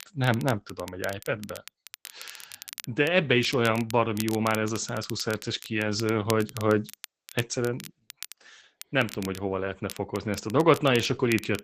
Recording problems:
garbled, watery; badly; nothing above 8 kHz
crackle, like an old record; noticeable; 15 dB below the speech

